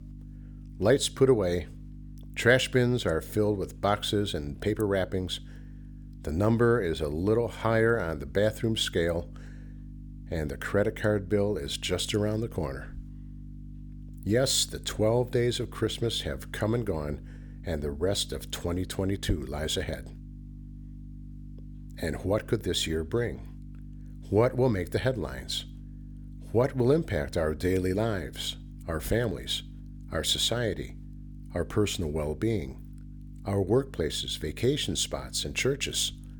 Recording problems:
electrical hum; faint; throughout; 50 Hz, 25 dB below the speech

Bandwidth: 18.5 kHz